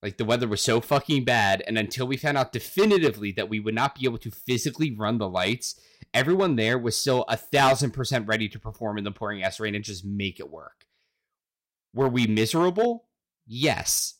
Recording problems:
distortion; slight; 3% of the sound clipped

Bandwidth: 16 kHz